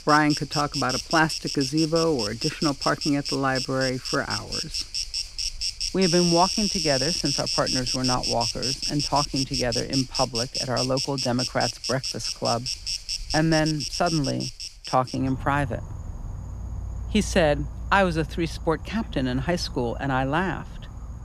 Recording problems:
animal sounds; loud; throughout; 3 dB below the speech

